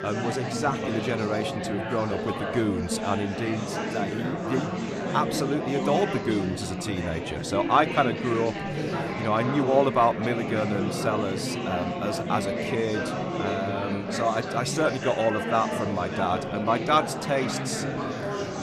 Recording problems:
chatter from many people; loud; throughout; 3 dB below the speech

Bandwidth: 14 kHz